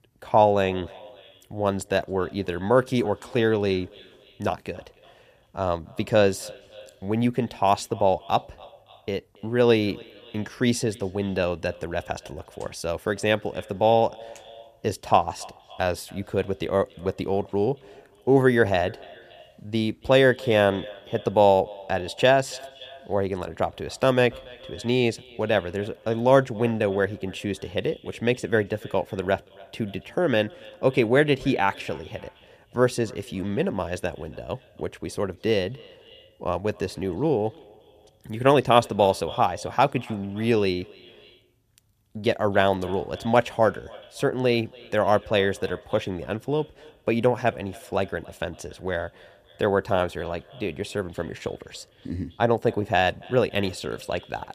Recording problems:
echo of what is said; faint; throughout; 280 ms later, 20 dB below the speech

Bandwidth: 14.5 kHz